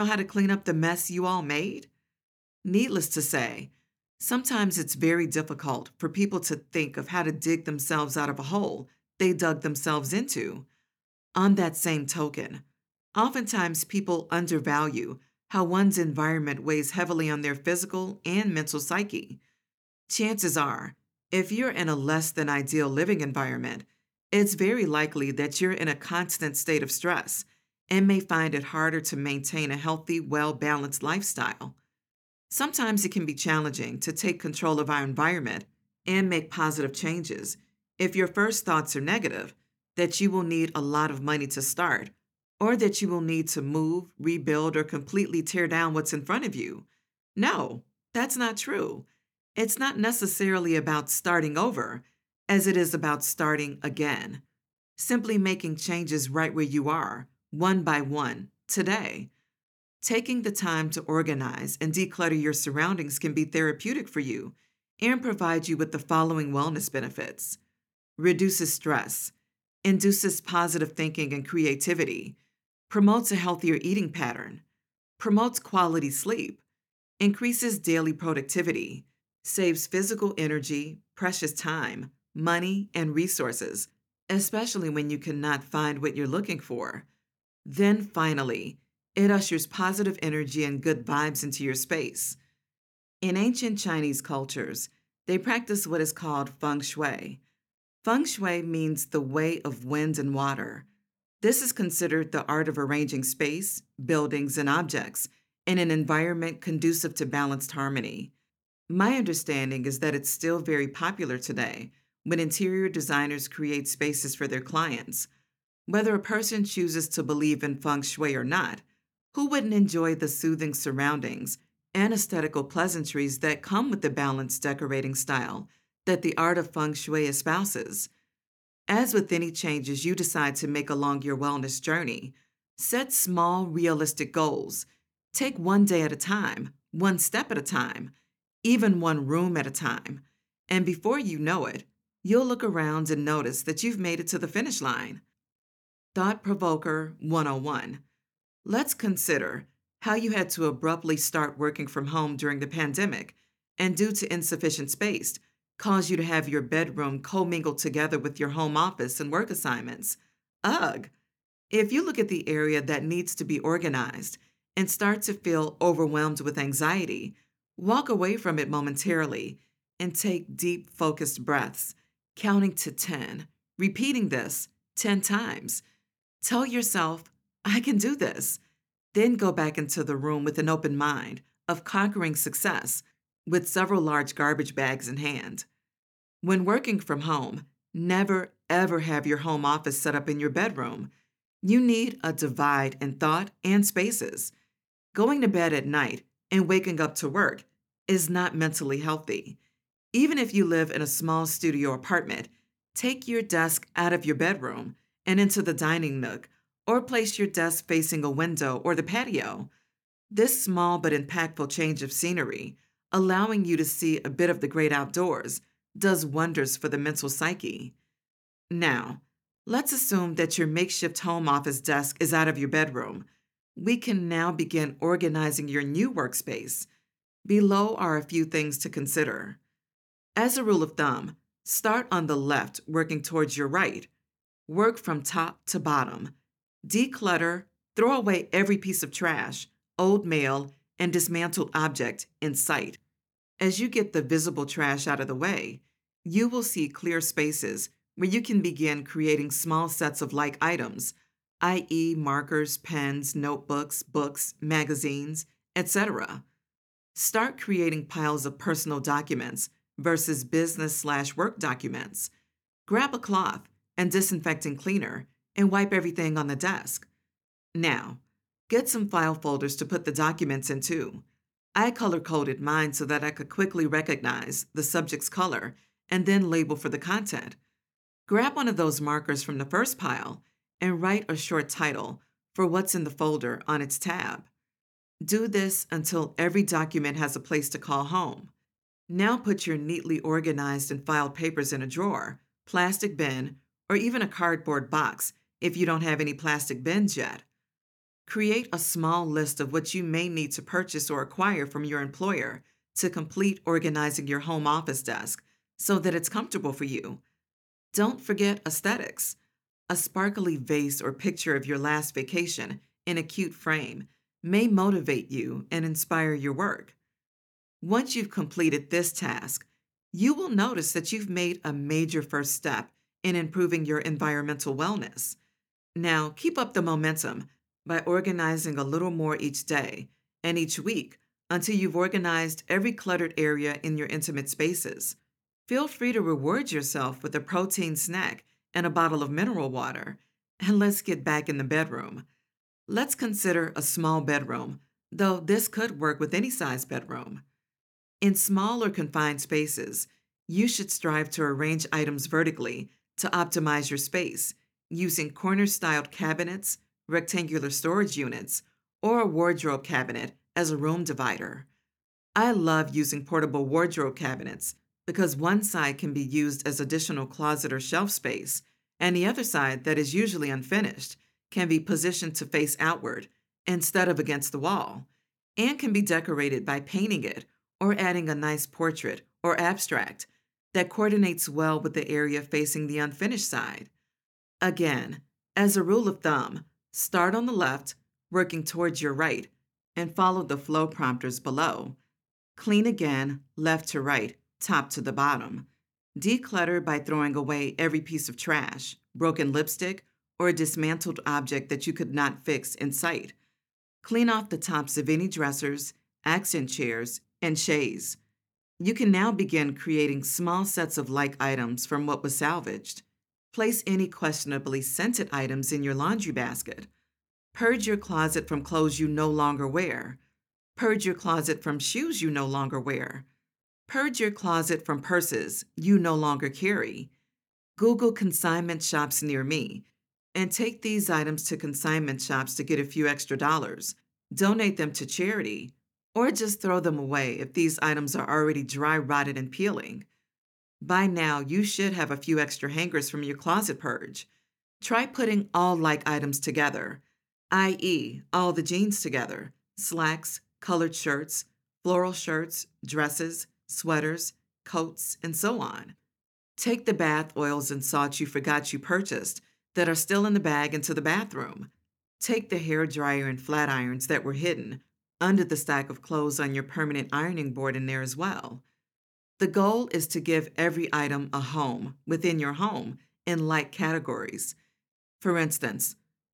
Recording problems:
abrupt cut into speech; at the start

